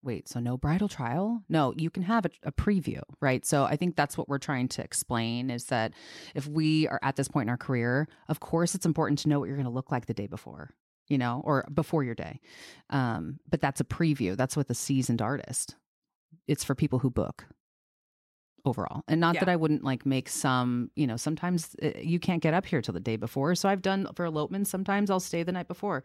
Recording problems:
none

